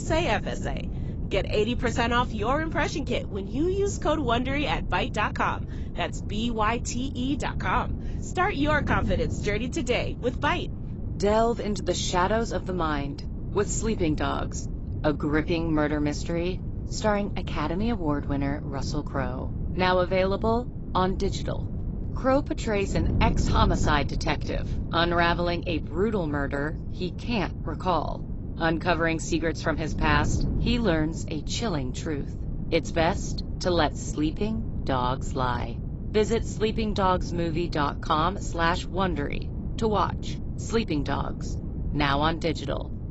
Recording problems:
garbled, watery; badly; nothing above 7.5 kHz
wind noise on the microphone; occasional gusts; 15 dB below the speech
abrupt cut into speech; at the start

